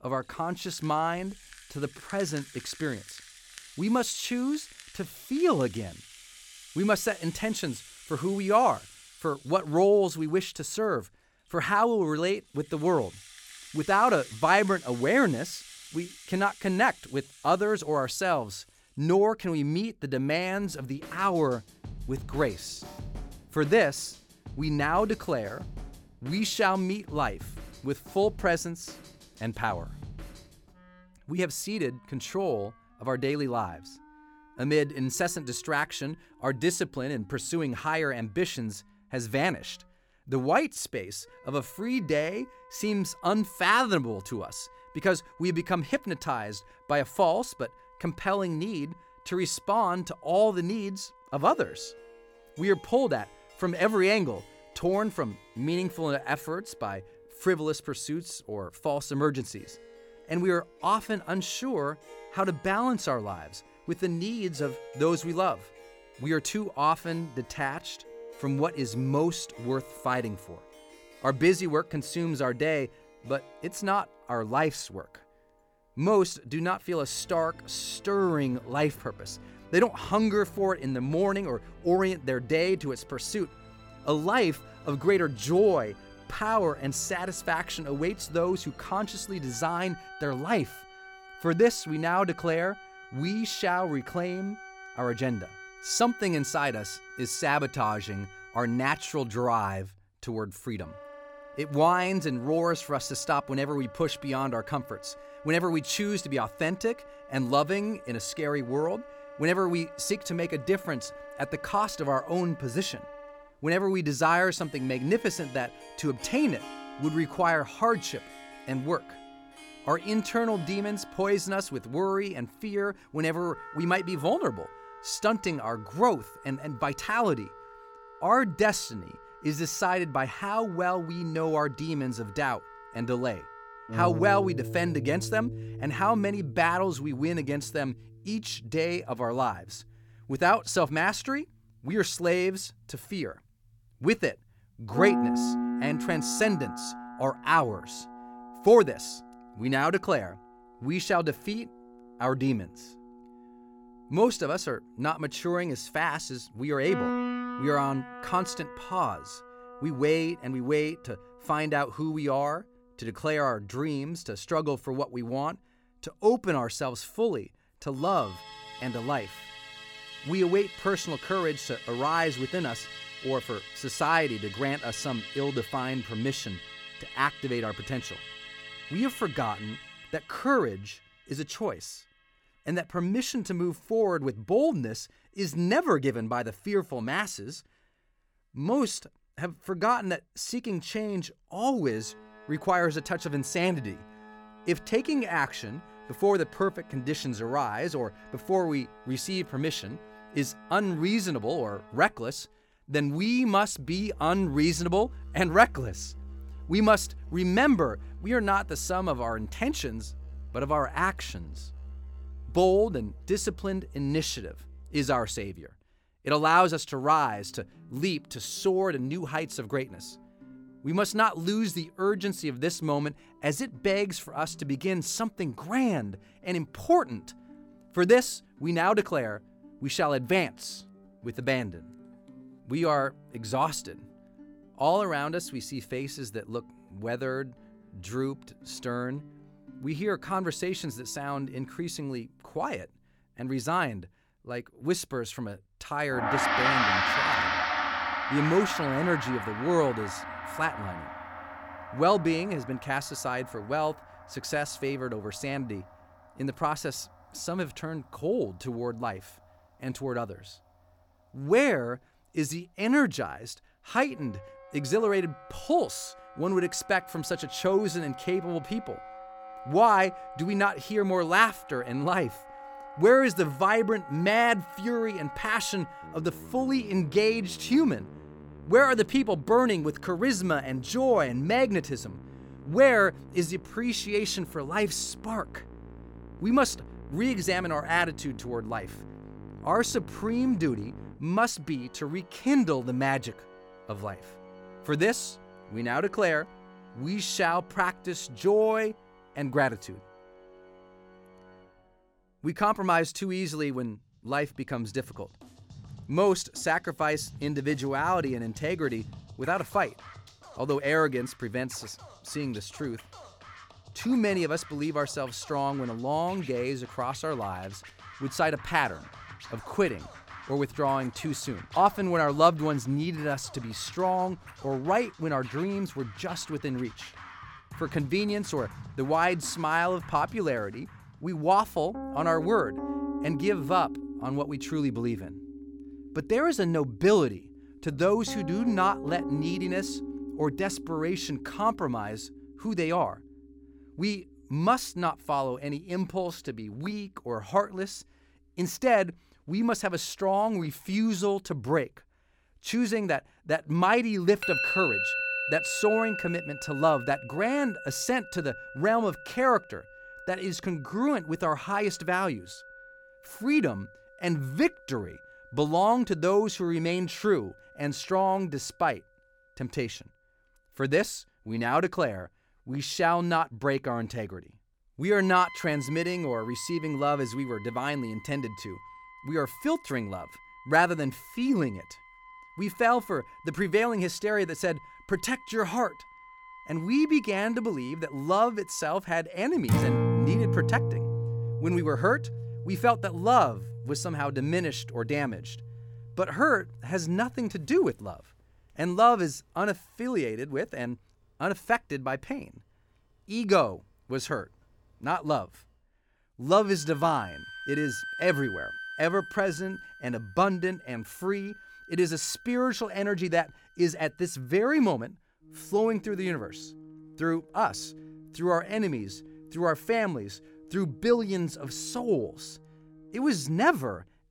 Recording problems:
background music; noticeable; throughout; 10 dB below the speech

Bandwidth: 18 kHz